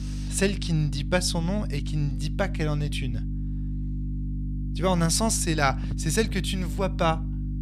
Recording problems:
electrical hum; noticeable; throughout; 50 Hz, 15 dB below the speech

